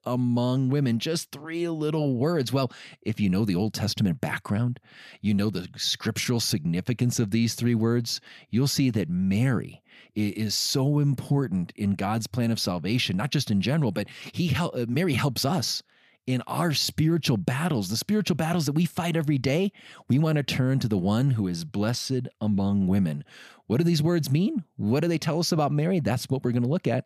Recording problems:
none

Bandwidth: 15 kHz